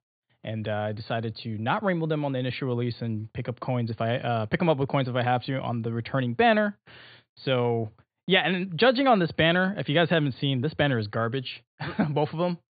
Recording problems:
high frequencies cut off; severe; nothing above 4.5 kHz

